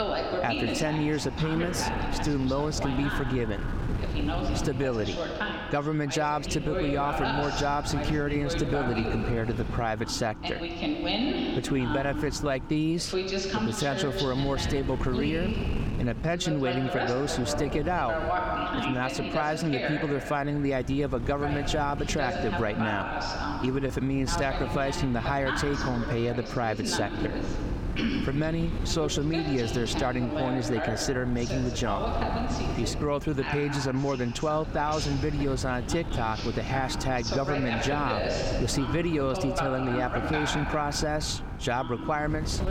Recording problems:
squashed, flat; somewhat
voice in the background; loud; throughout; 4 dB below the speech
wind noise on the microphone; occasional gusts; 15 dB below the speech

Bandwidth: 17 kHz